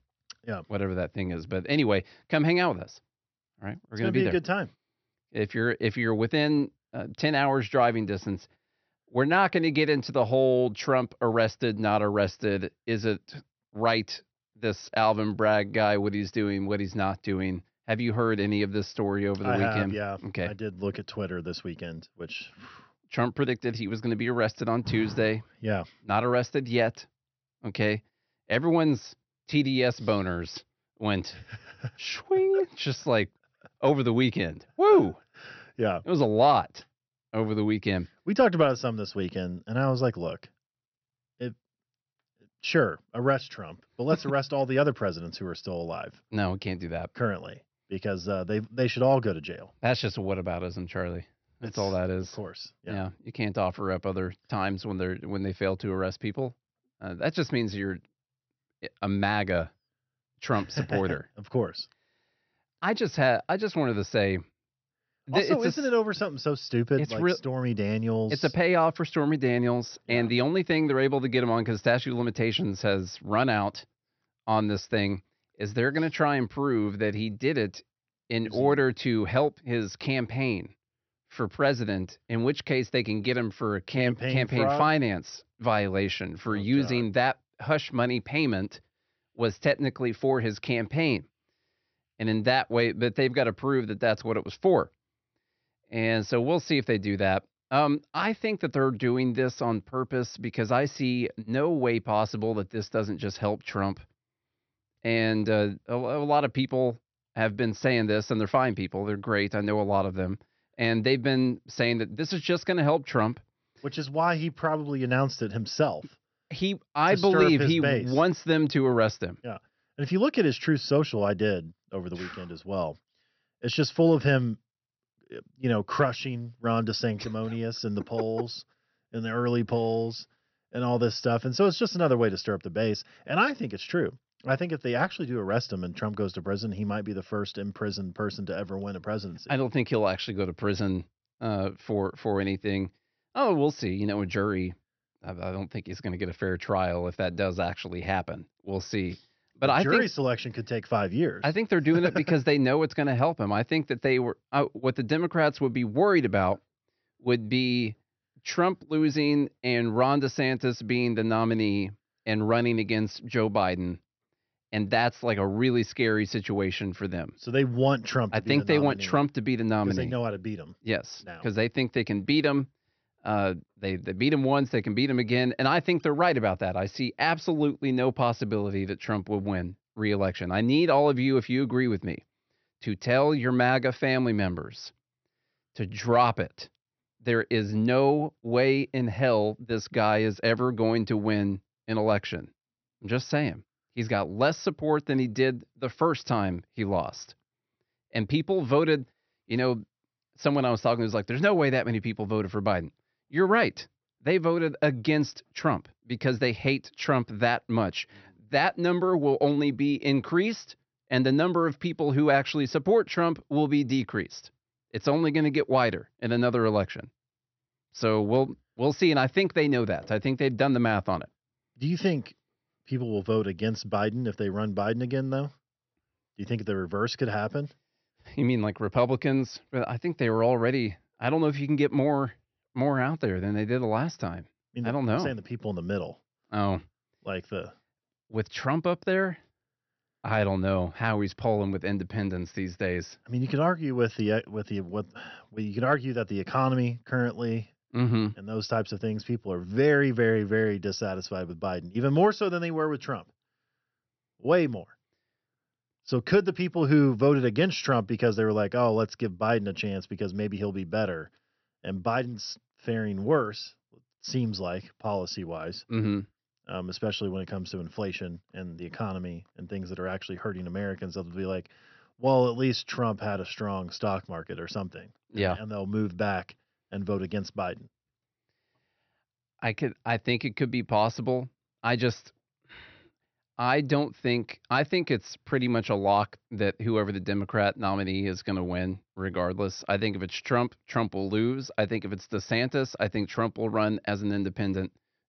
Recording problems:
high frequencies cut off; noticeable; nothing above 6 kHz

